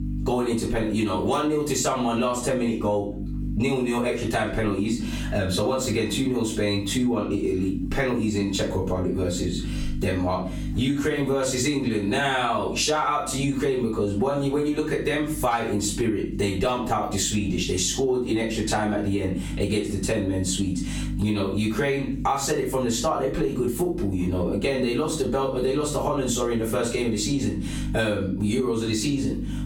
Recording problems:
off-mic speech; far
squashed, flat; heavily
room echo; slight; dies away in 0.3 s
electrical hum; faint; throughout; 50 Hz, 20 dB below the speech

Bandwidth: 17.5 kHz